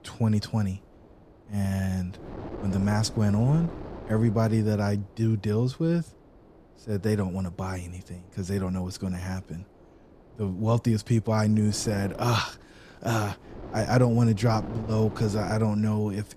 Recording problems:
wind noise on the microphone; occasional gusts; 15 dB below the speech

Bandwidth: 14 kHz